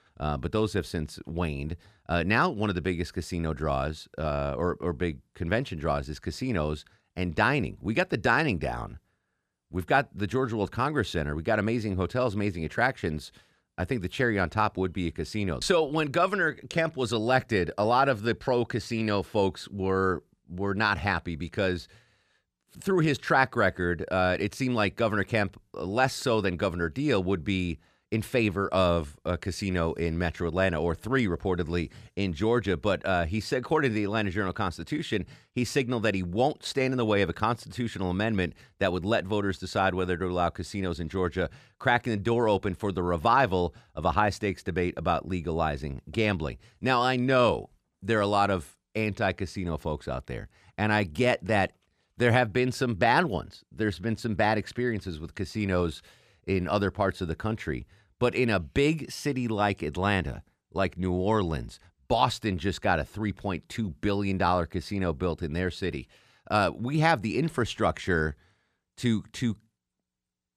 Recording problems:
none

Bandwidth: 14.5 kHz